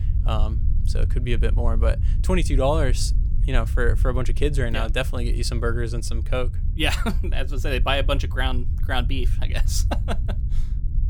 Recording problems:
low rumble; noticeable; throughout; 15 dB below the speech

